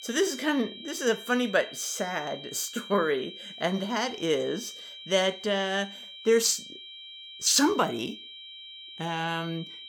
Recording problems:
high-pitched whine; noticeable; throughout; 3 kHz, 15 dB below the speech

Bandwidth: 17.5 kHz